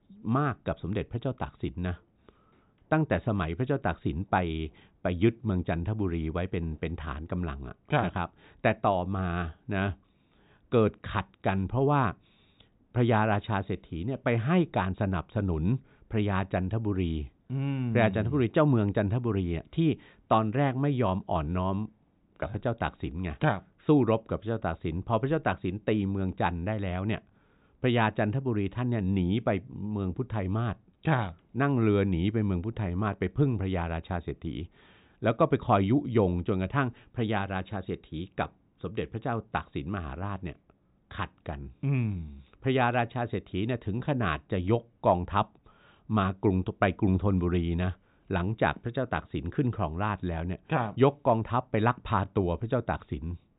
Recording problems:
high frequencies cut off; severe; nothing above 4 kHz

